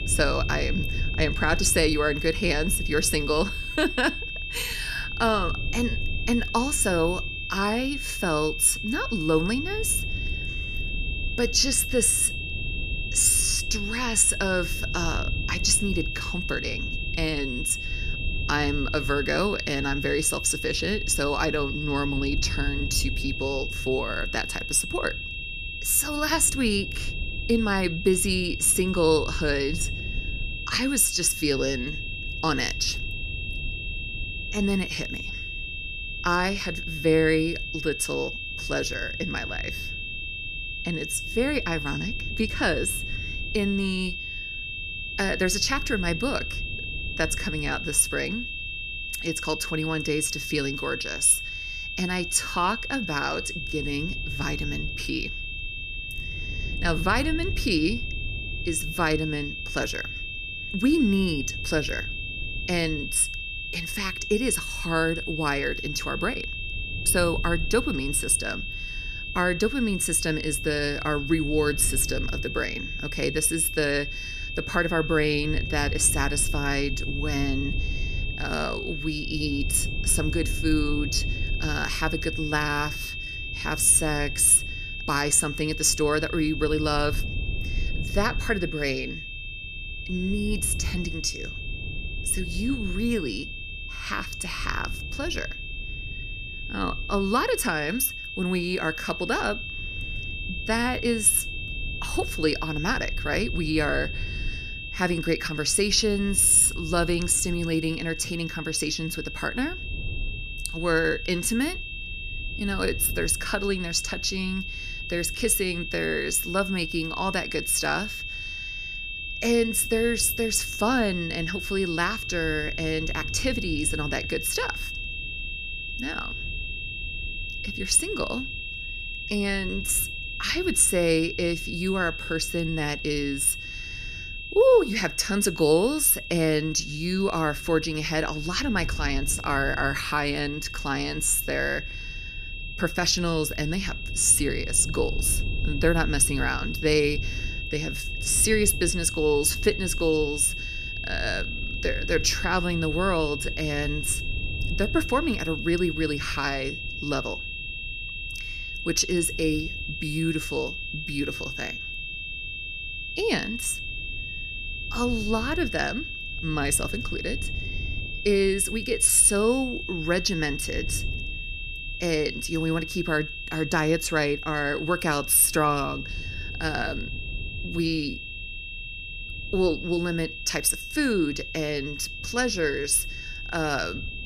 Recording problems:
high-pitched whine; loud; throughout; 2.5 kHz, 7 dB below the speech
low rumble; faint; throughout; 25 dB below the speech

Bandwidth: 14.5 kHz